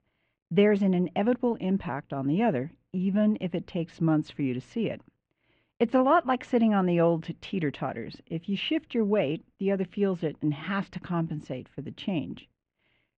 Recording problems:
muffled; very; fading above 2.5 kHz

